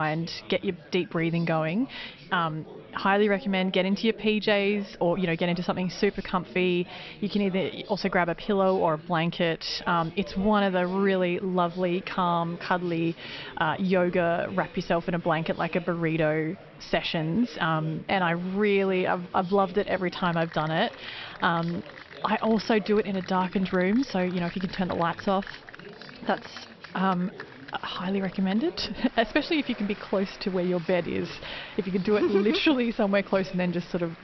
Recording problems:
high frequencies cut off; noticeable; nothing above 5.5 kHz
chatter from many people; noticeable; throughout; 20 dB below the speech
abrupt cut into speech; at the start

